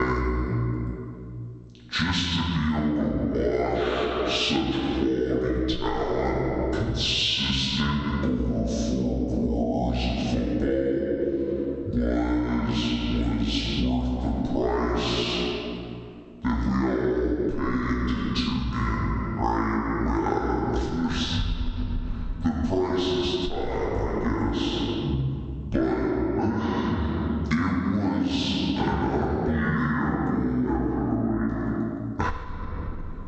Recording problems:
off-mic speech; far
wrong speed and pitch; too slow and too low; 0.5 times normal speed
echo of what is said; noticeable; throughout; 90 ms later, 15 dB below the speech
room echo; noticeable; dies away in 1.8 s
squashed, flat; somewhat
abrupt cut into speech; at the start

